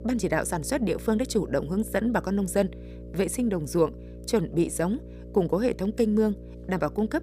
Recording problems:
electrical hum; noticeable; throughout; 60 Hz, 20 dB below the speech

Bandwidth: 15 kHz